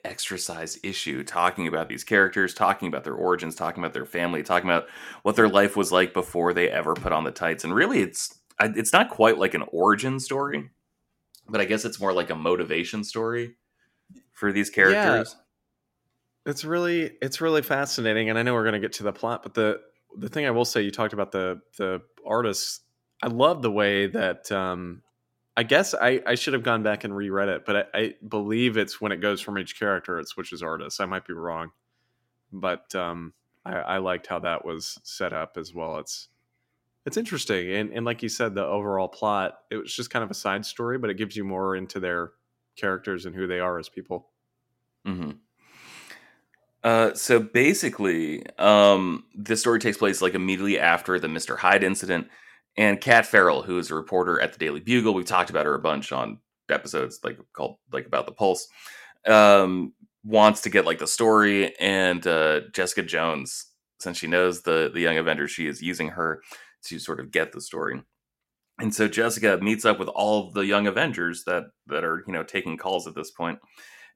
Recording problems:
none

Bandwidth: 16.5 kHz